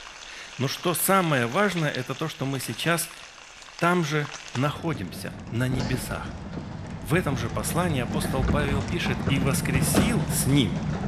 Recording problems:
household noises; loud; throughout; 5 dB below the speech

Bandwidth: 14.5 kHz